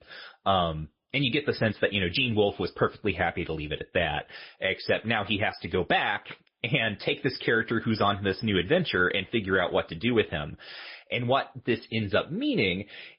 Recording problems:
garbled, watery; slightly; nothing above 5 kHz
high frequencies cut off; slight

